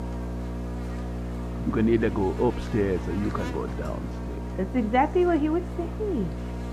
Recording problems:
muffled; very; fading above 4 kHz
electrical hum; noticeable; throughout; 60 Hz, 10 dB below the speech

